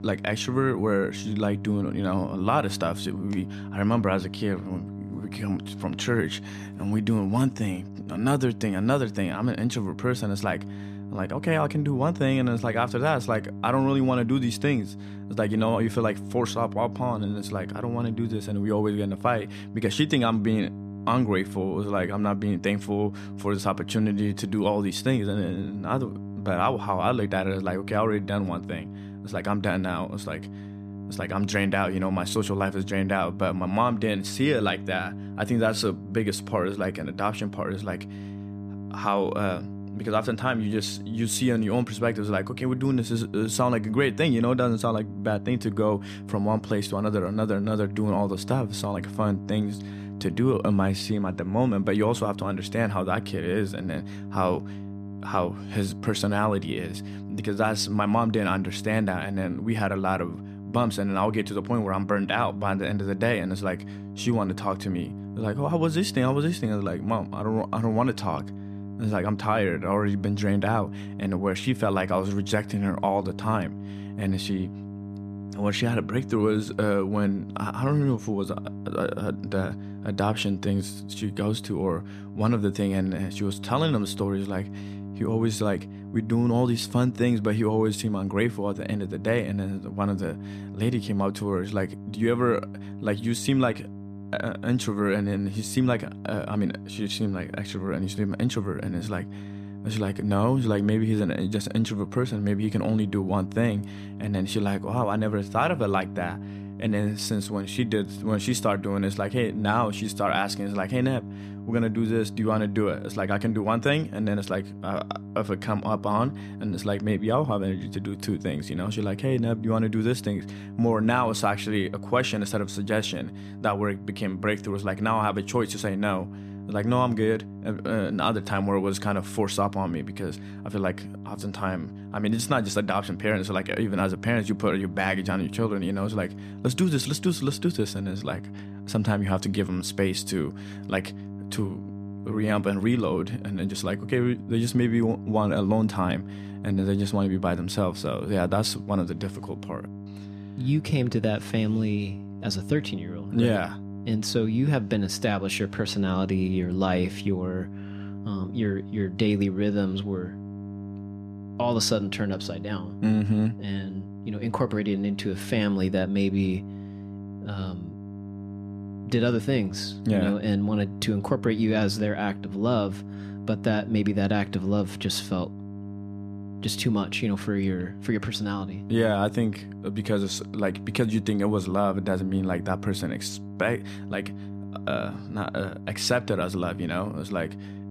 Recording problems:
electrical hum; noticeable; throughout; 50 Hz, 15 dB below the speech

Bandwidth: 14.5 kHz